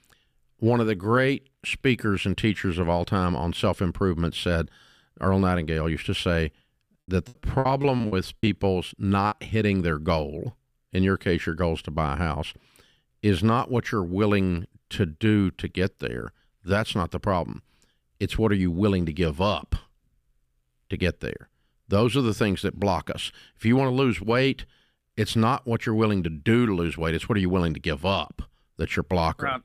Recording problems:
choppy; very; from 7.5 to 9.5 s; 19% of the speech affected

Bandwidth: 15 kHz